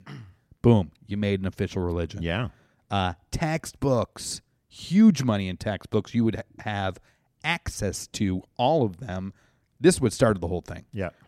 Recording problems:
none

